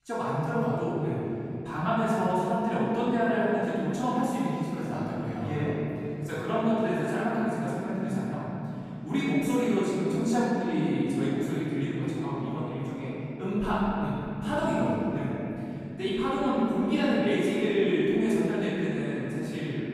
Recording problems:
room echo; strong; dies away in 3 s
off-mic speech; far

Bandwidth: 14.5 kHz